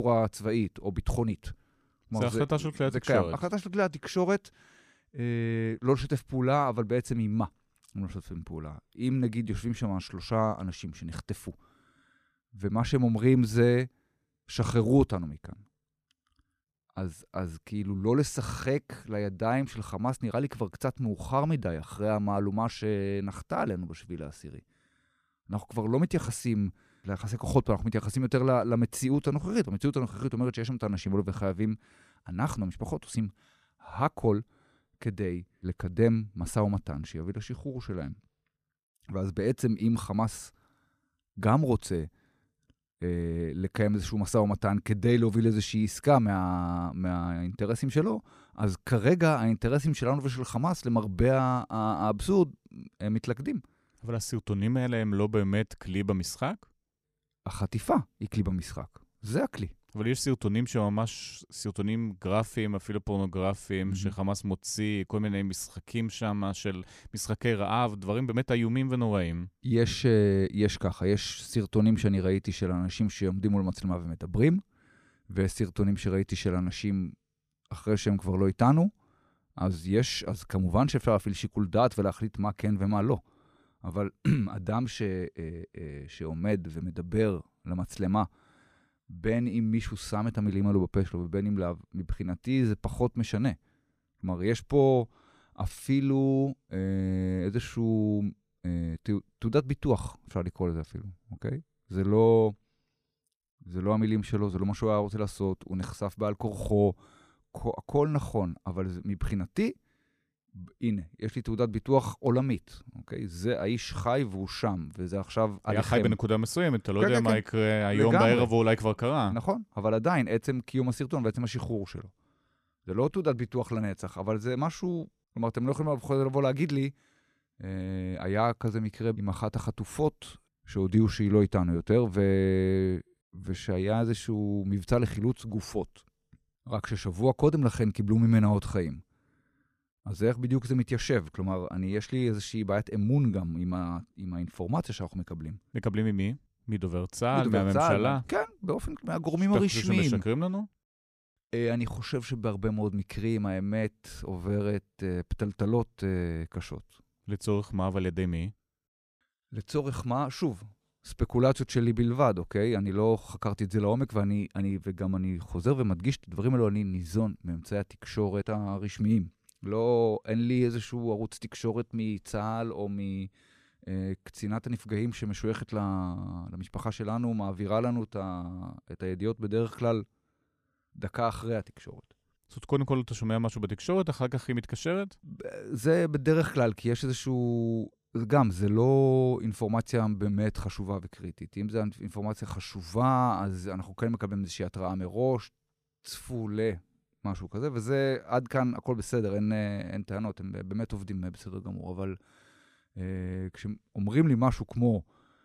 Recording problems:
abrupt cut into speech; at the start

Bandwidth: 14.5 kHz